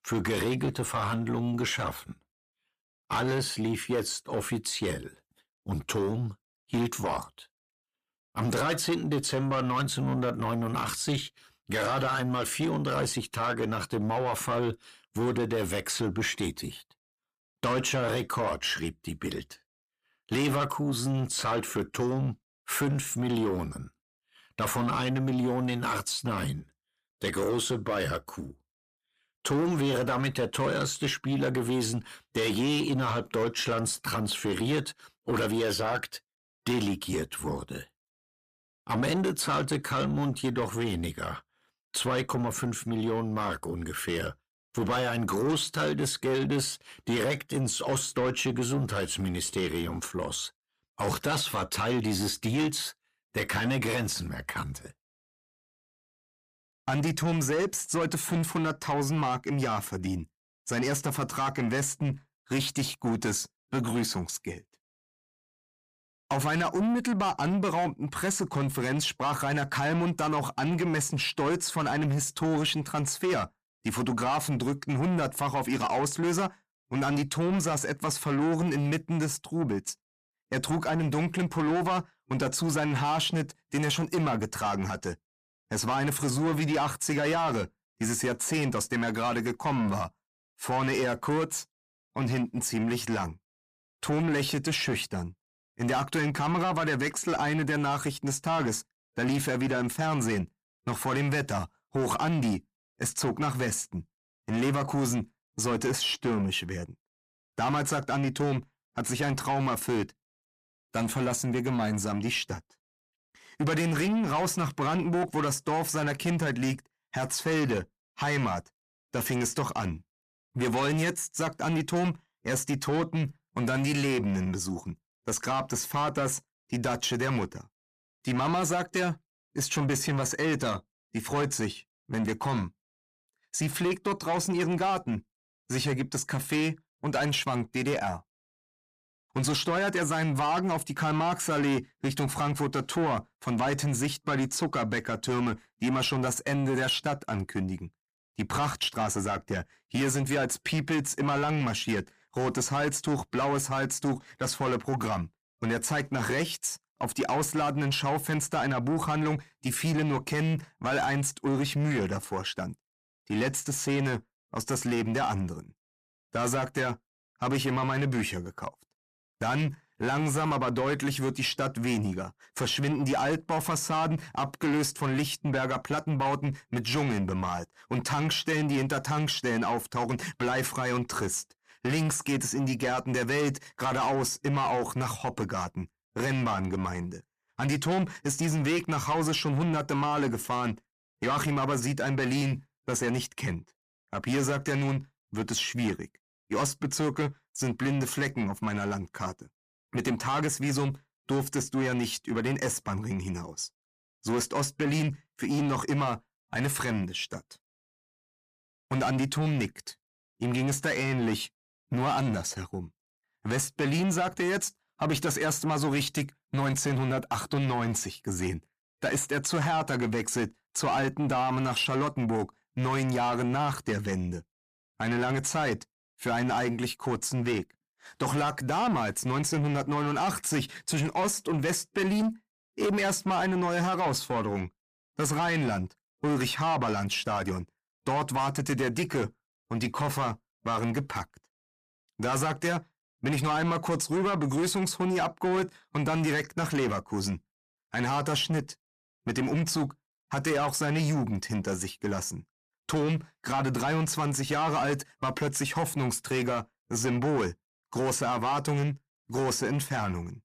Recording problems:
distortion; slight; 10 dB below the speech

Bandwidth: 15 kHz